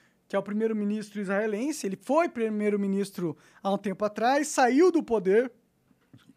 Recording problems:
none

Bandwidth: 15 kHz